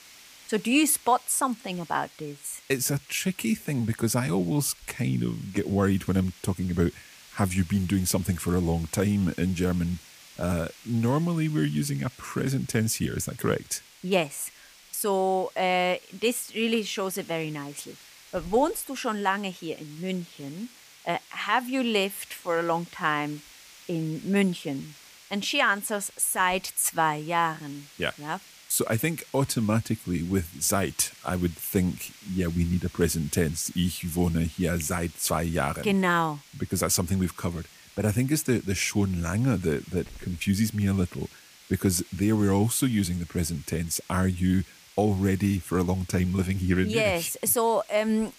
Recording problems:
hiss; faint; throughout; 20 dB below the speech

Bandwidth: 15 kHz